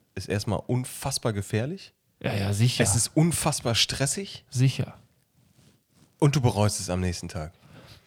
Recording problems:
none

